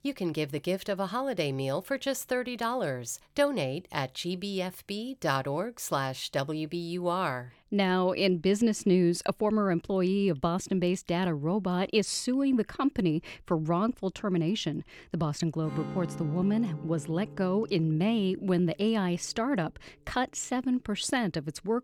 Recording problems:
background music; noticeable; throughout; 15 dB below the speech

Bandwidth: 17.5 kHz